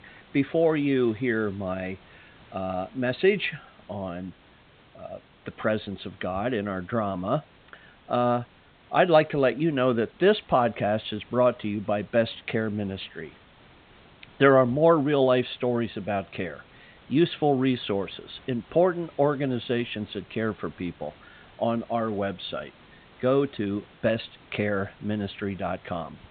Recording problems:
high frequencies cut off; severe; nothing above 4 kHz
hiss; faint; throughout; 25 dB below the speech

